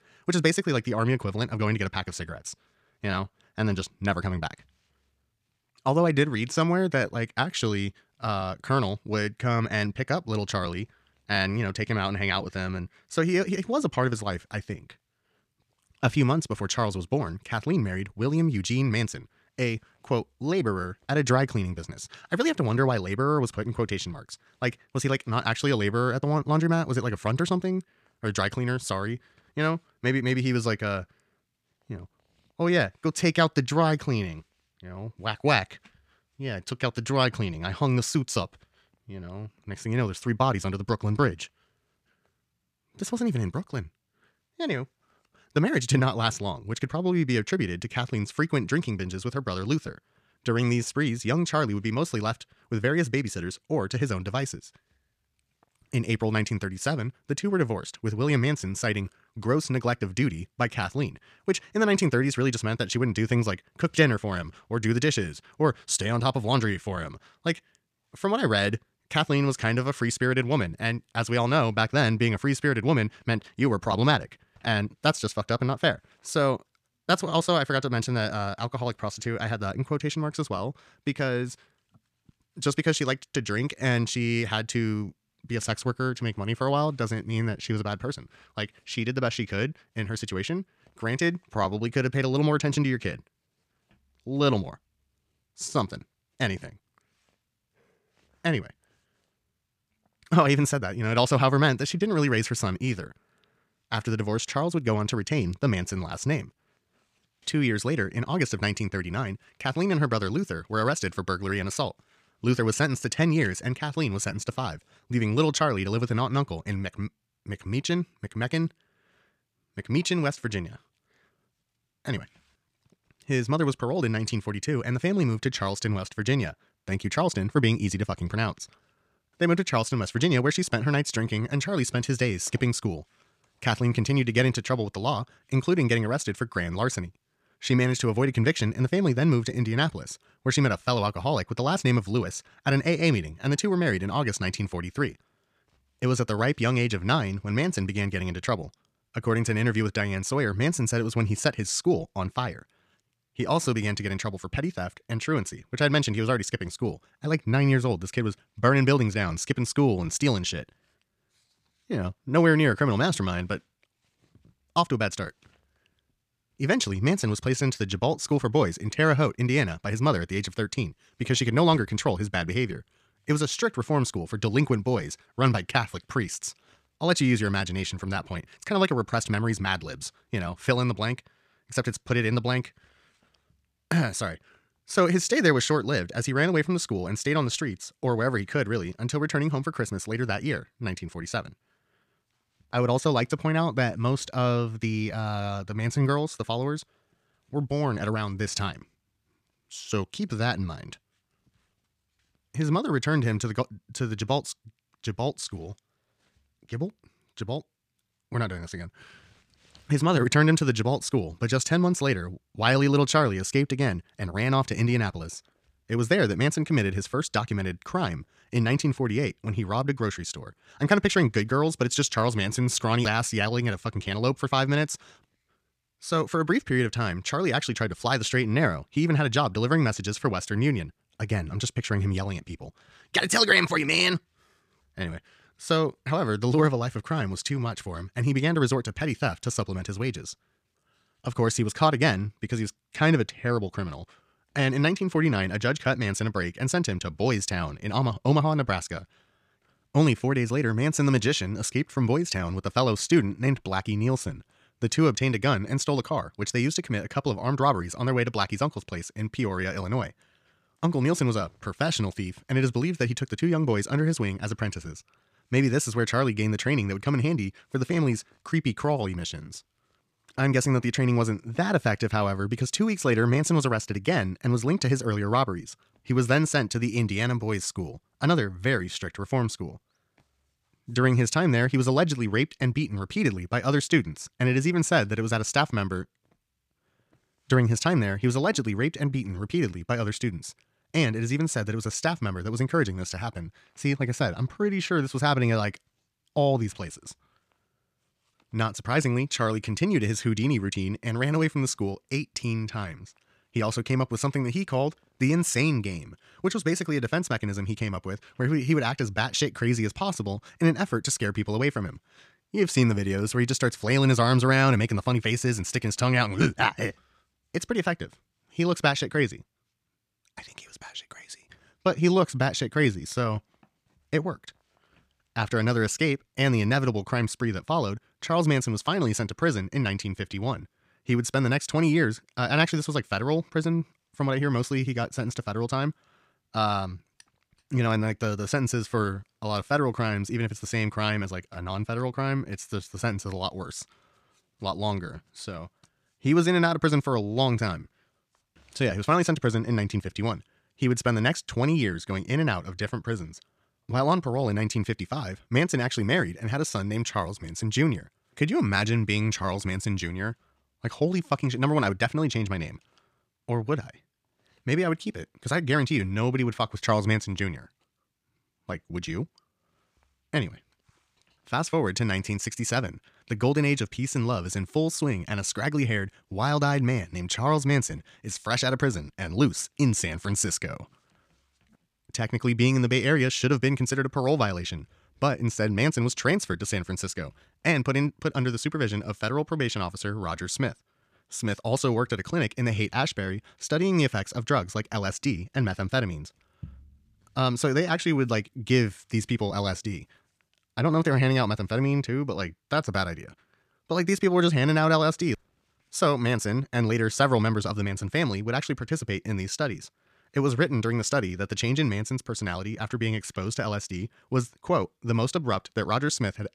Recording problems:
wrong speed, natural pitch; too fast; 1.5 times normal speed

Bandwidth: 14.5 kHz